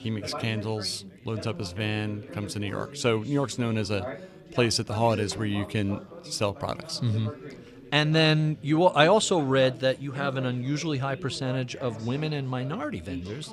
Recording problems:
background chatter; noticeable; throughout; 4 voices, 15 dB below the speech

